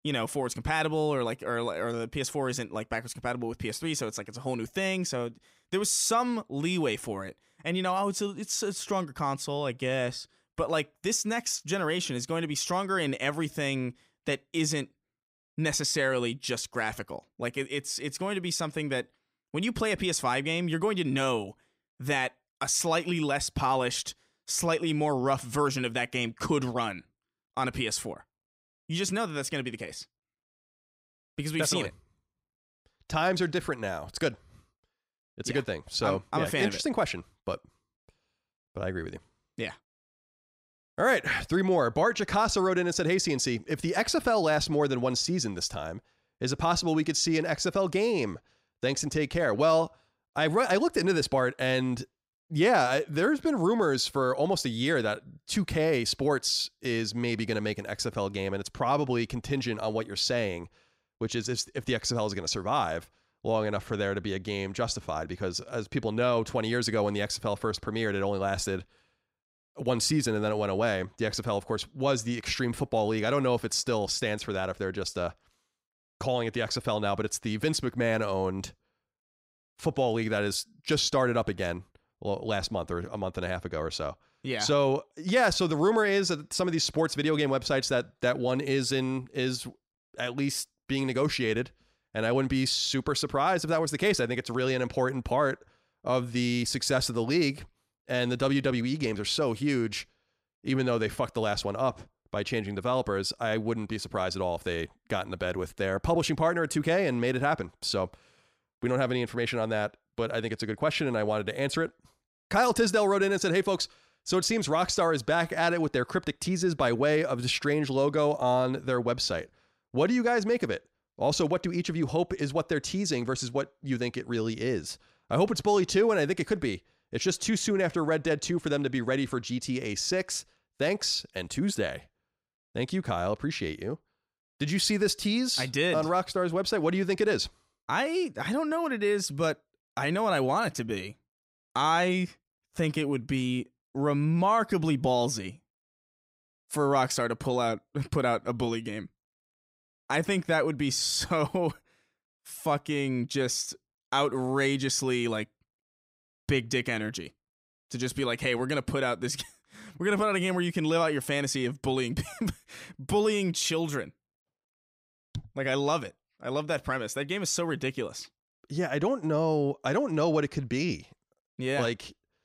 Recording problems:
none

